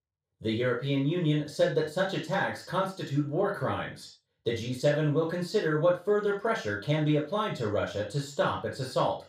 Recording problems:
off-mic speech; far
room echo; noticeable; dies away in 0.3 s

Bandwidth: 15.5 kHz